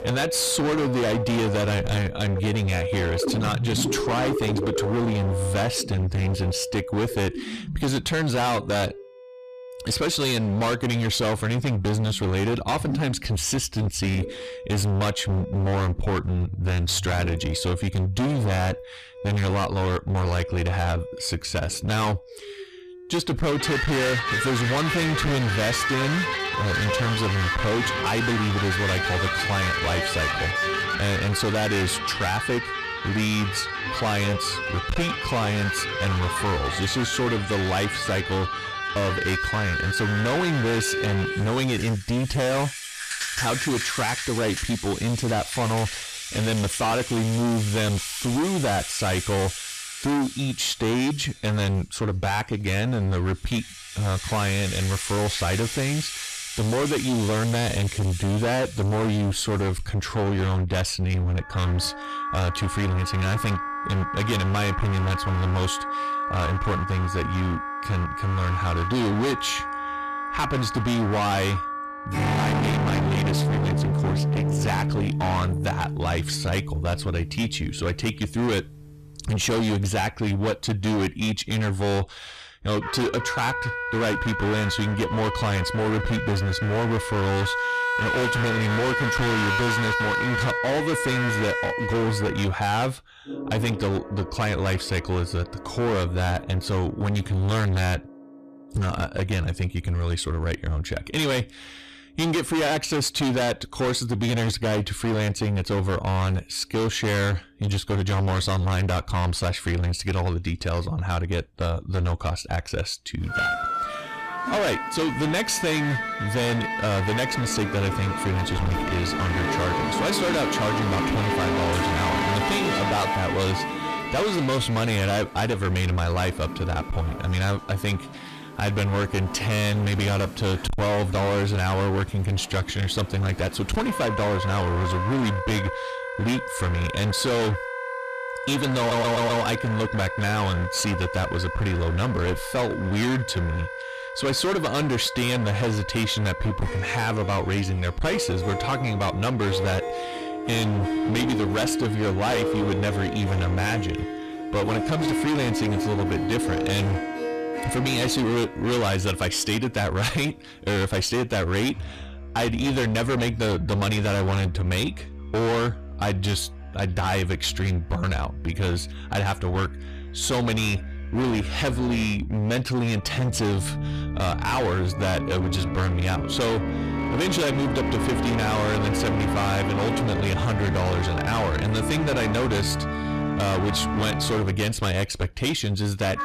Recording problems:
distortion; heavy; 30% of the sound clipped
background music; loud; throughout; 4 dB below the speech
audio stuttering; at 2:19

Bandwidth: 14.5 kHz